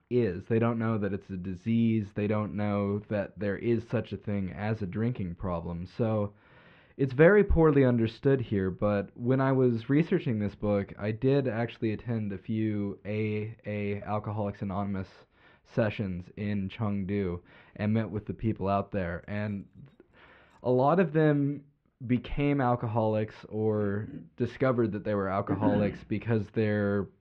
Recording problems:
muffled; very; fading above 2.5 kHz
jangling keys; very faint; from 19 to 21 s; peak 40 dB below the speech

